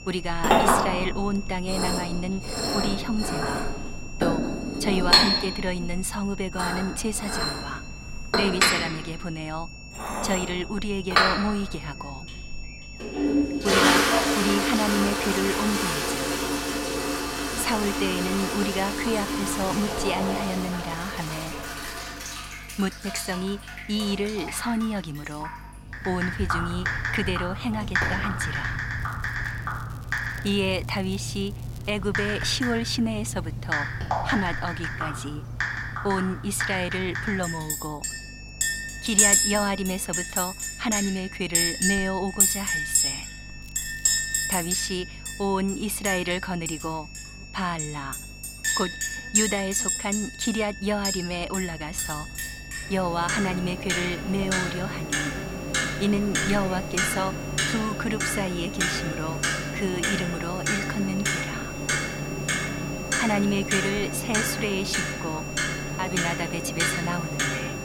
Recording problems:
household noises; very loud; throughout; 2 dB above the speech
high-pitched whine; noticeable; until 19 s and from 38 s on; 2.5 kHz, 10 dB below the speech
electrical hum; faint; throughout; 50 Hz, 20 dB below the speech
crackling; faint; from 29 to 32 s and at 44 s; 25 dB below the speech

